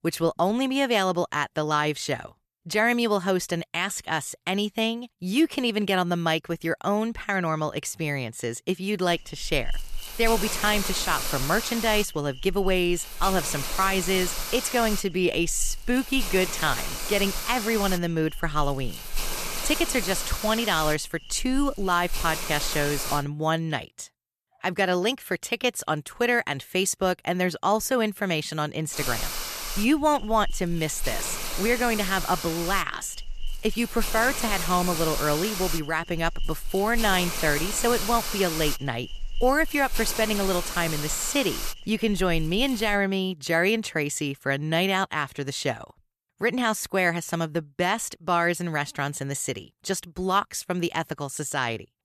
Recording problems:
hiss; loud; from 9 to 23 s and from 29 to 43 s; 6 dB below the speech

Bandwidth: 14 kHz